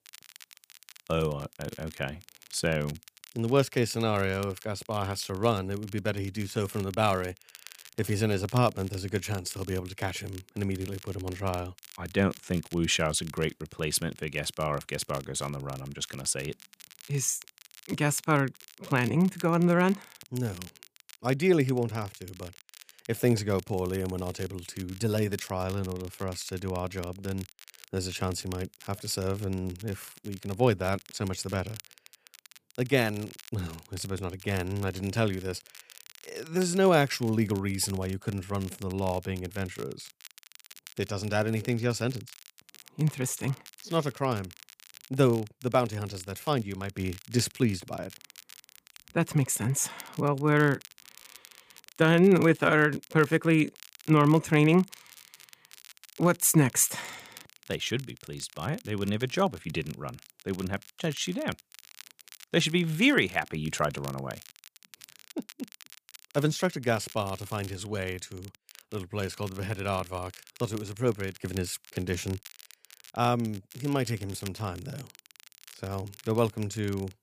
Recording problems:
crackle, like an old record; faint; 20 dB below the speech

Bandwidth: 15 kHz